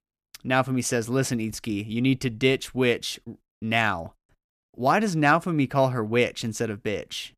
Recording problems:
none

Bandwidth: 14.5 kHz